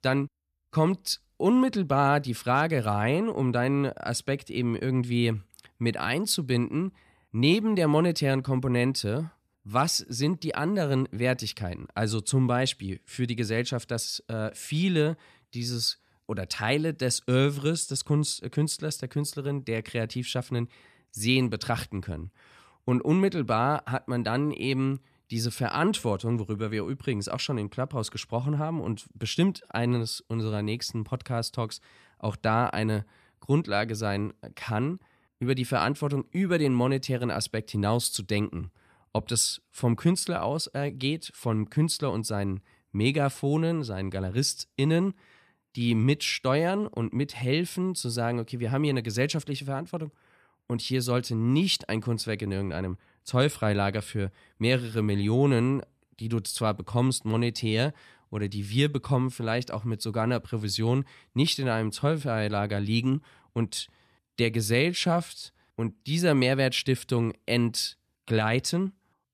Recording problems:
none

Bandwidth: 14 kHz